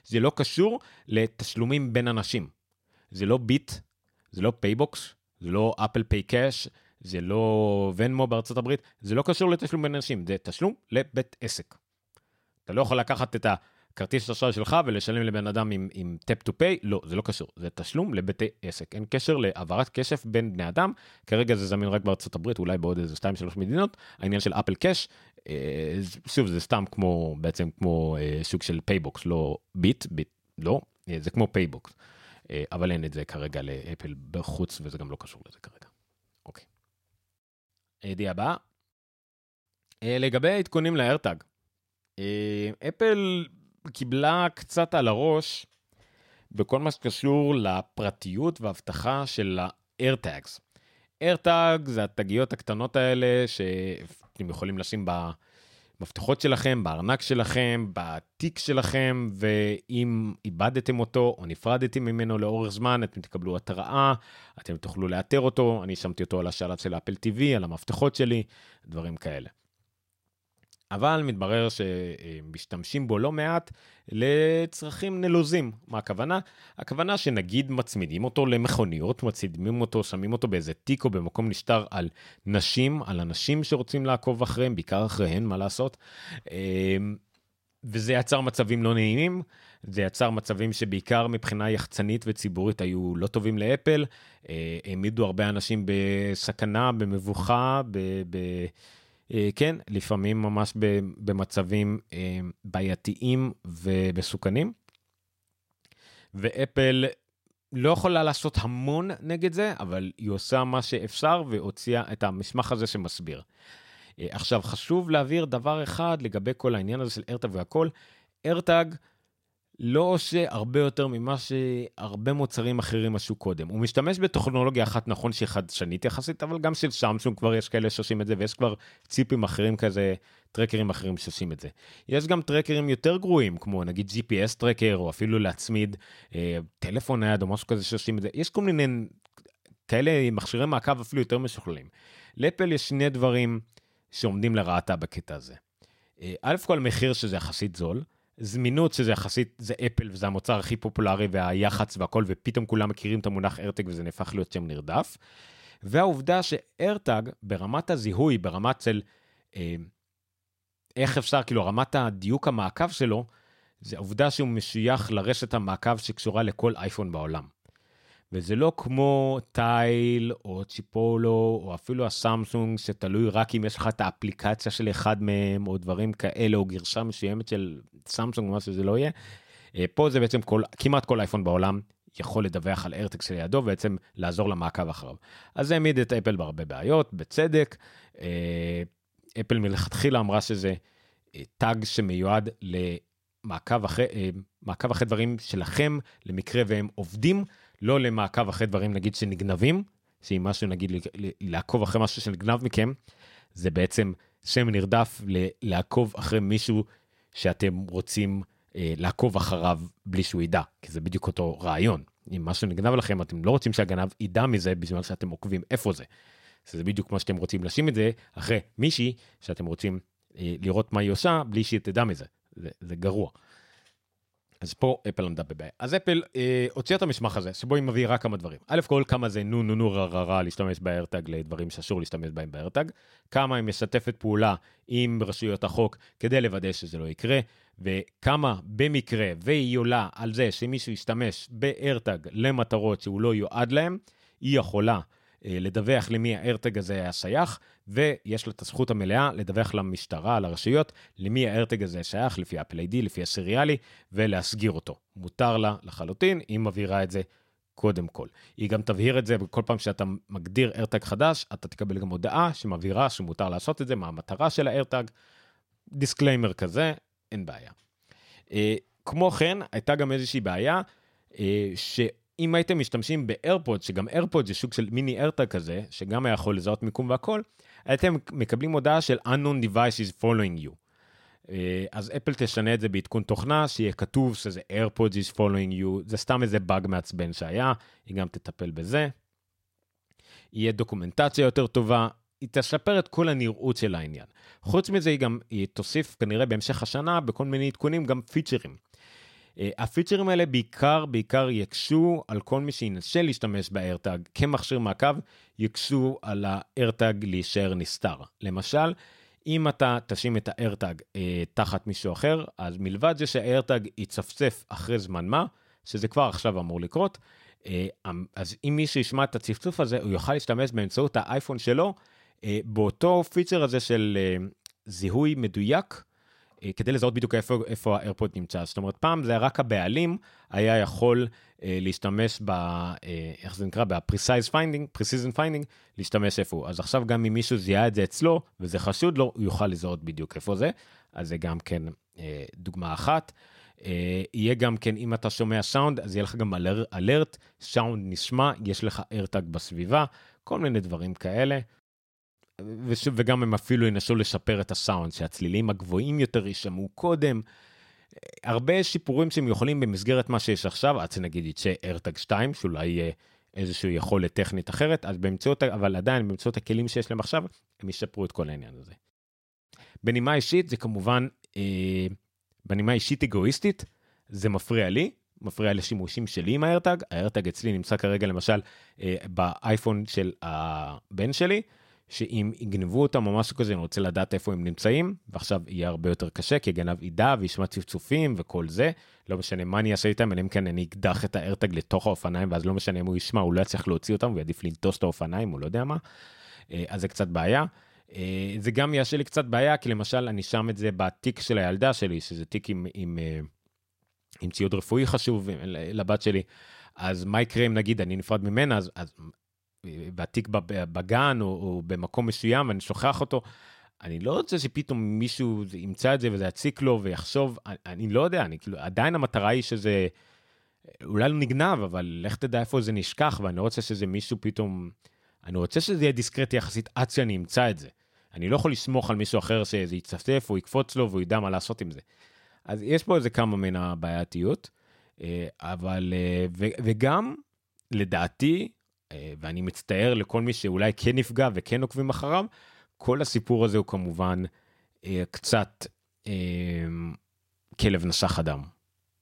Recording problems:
uneven, jittery; strongly; from 24 s to 7:02

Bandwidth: 16 kHz